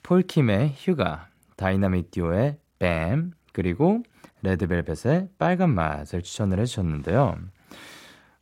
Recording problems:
none

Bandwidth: 16 kHz